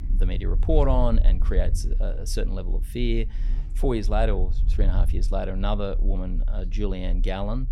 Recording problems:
traffic noise; noticeable; throughout; 20 dB below the speech
low rumble; noticeable; throughout; 20 dB below the speech

